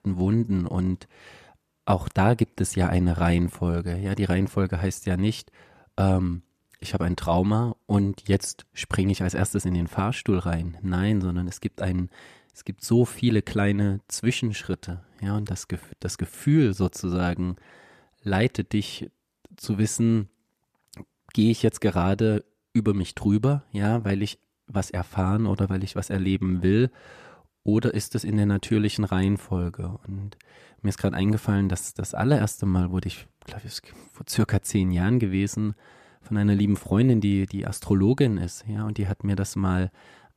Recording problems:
none

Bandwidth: 14.5 kHz